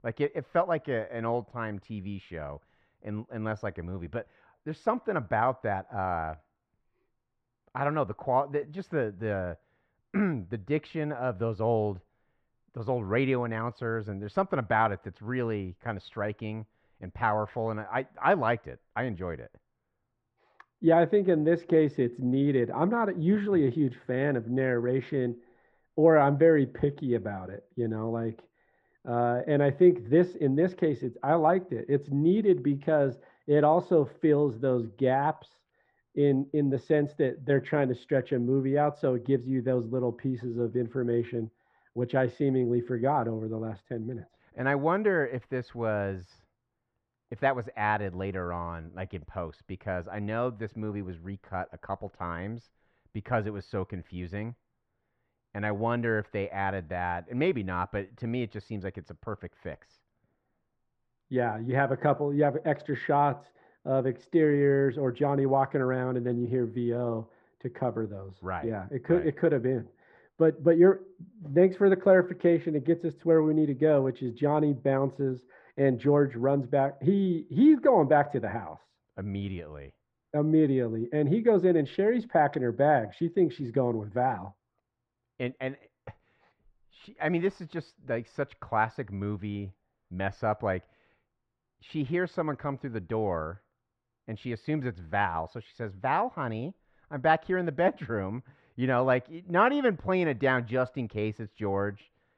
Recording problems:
muffled; very; fading above 1.5 kHz

